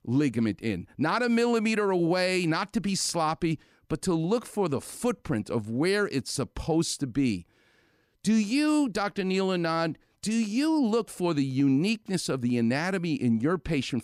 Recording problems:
none

